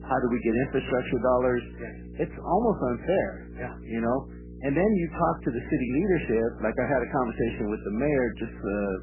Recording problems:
garbled, watery; badly; nothing above 3 kHz
electrical hum; faint; throughout; 60 Hz, 20 dB below the speech

